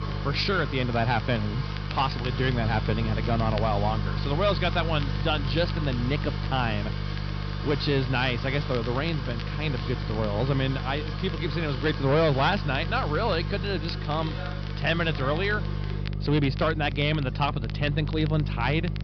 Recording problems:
high frequencies cut off; noticeable; nothing above 5.5 kHz
distortion; slight; 4% of the sound clipped
electrical hum; noticeable; throughout; 50 Hz, 15 dB below the speech
household noises; noticeable; throughout; 10 dB below the speech
crackle, like an old record; noticeable; 20 dB below the speech

